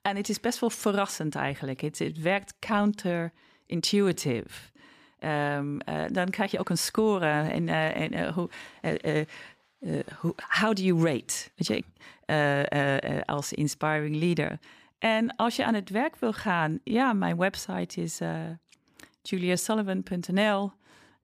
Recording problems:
uneven, jittery; strongly; from 2 to 20 s

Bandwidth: 14.5 kHz